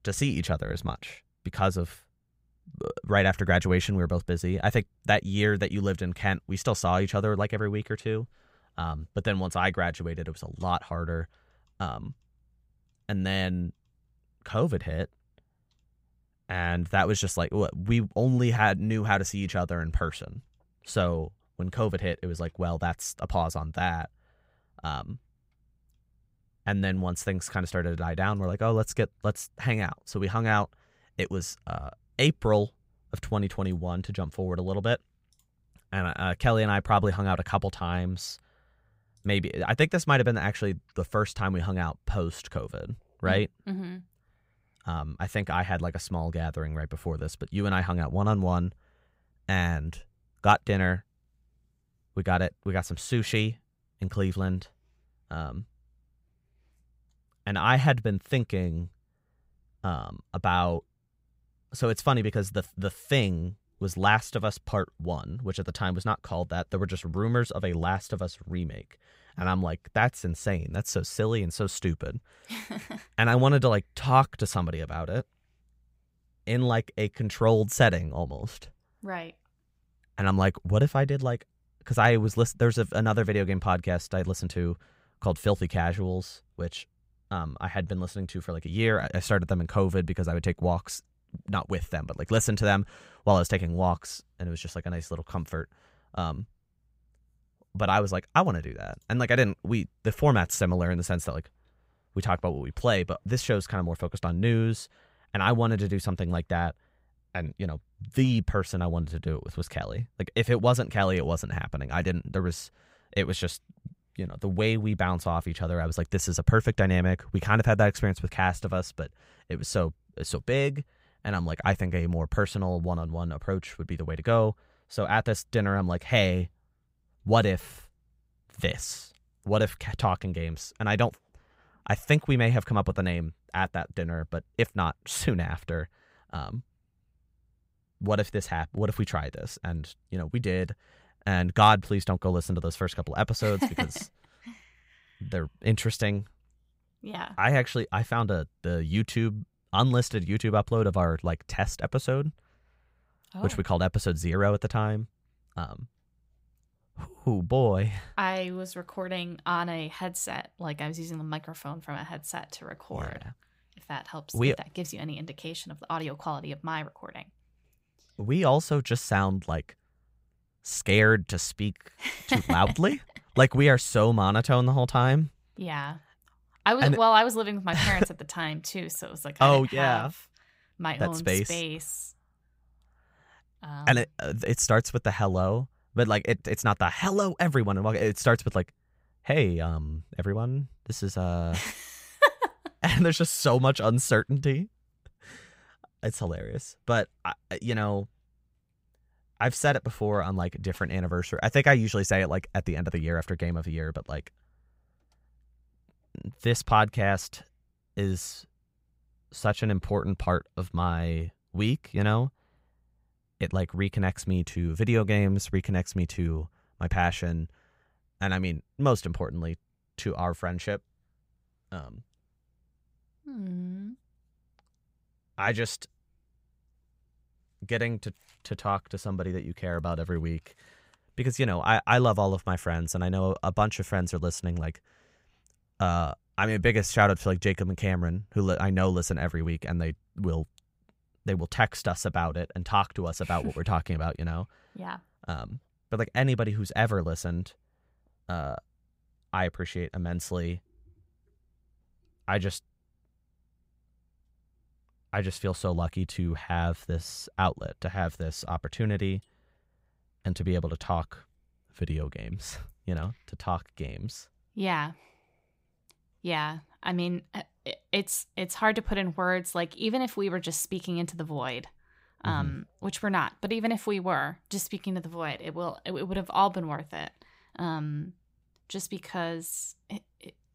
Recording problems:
none

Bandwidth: 15.5 kHz